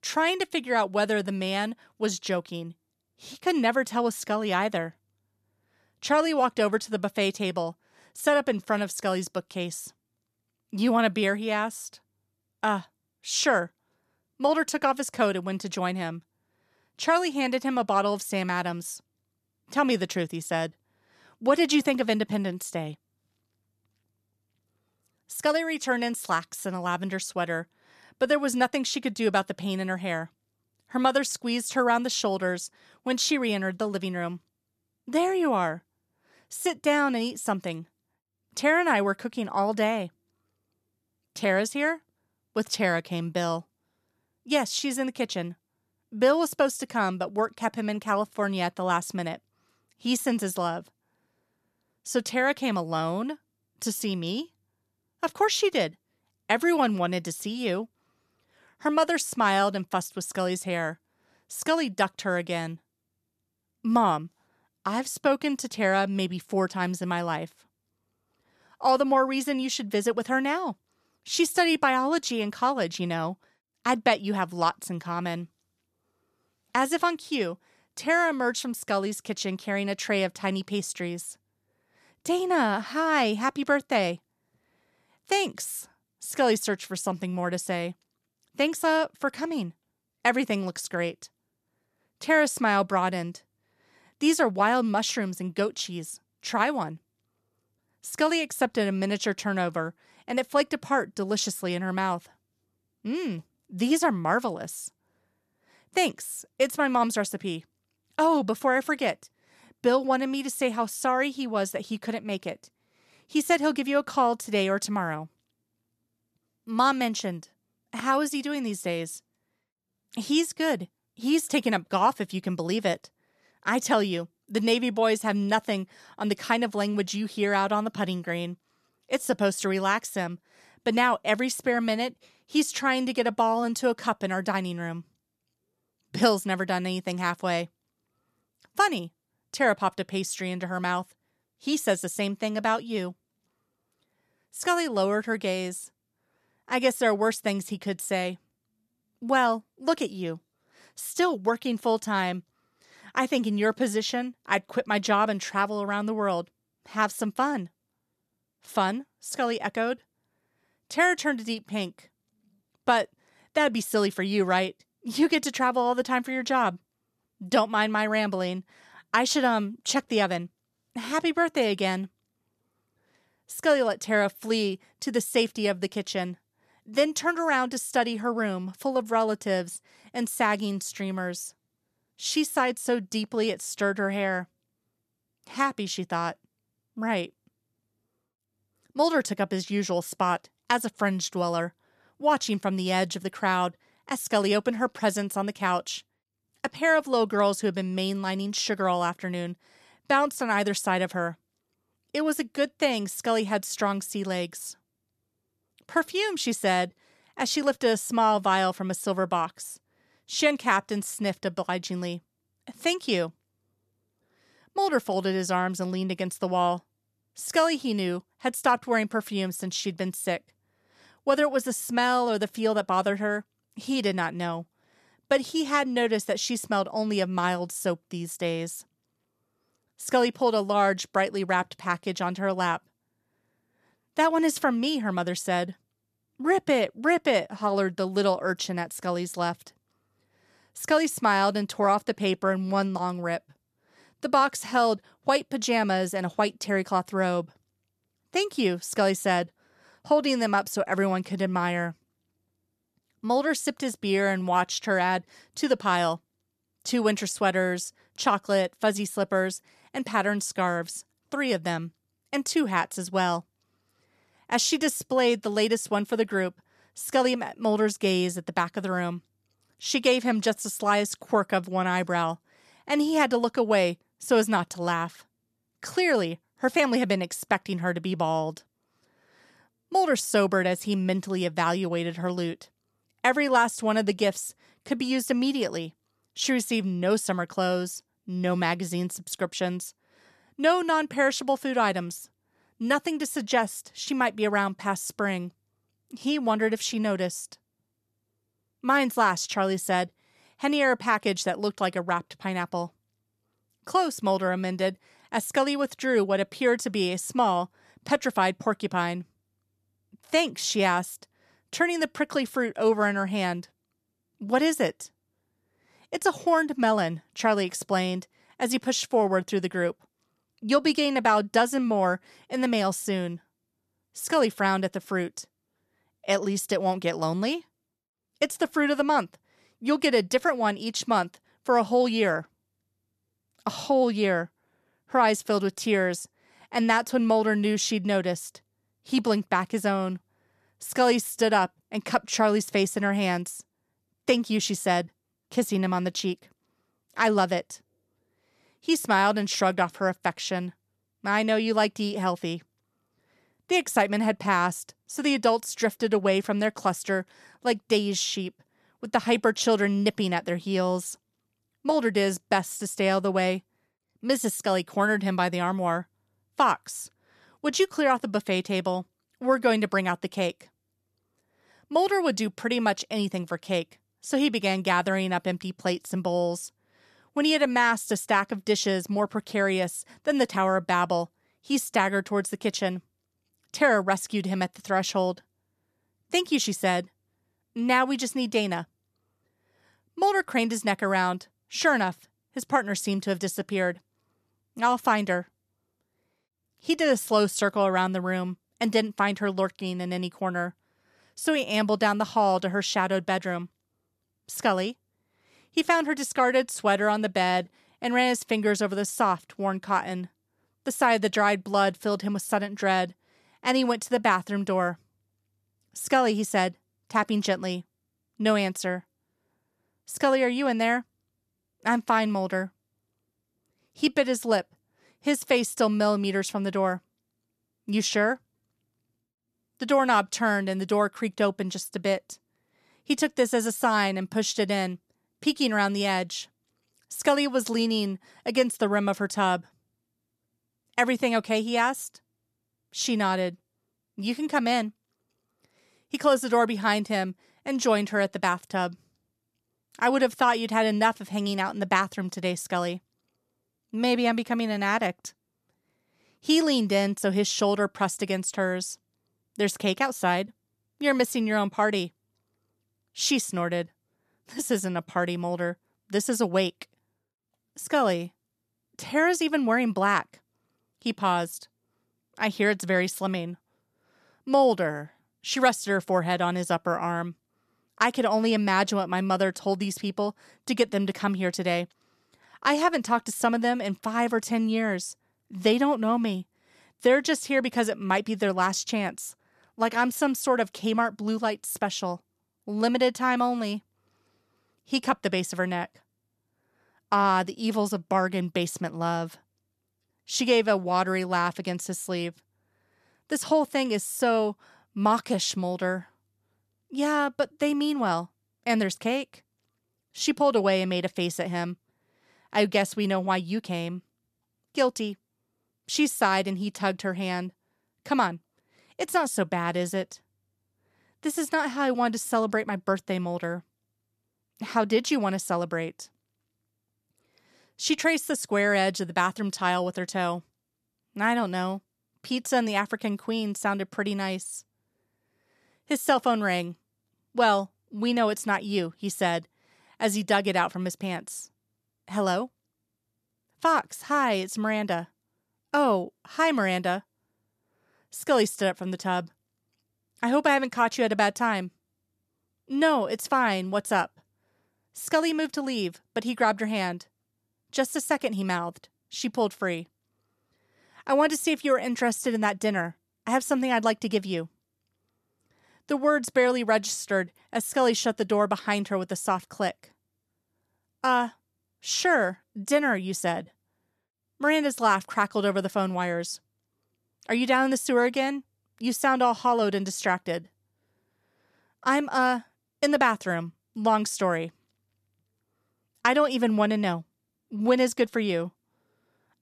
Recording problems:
none

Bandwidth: 13.5 kHz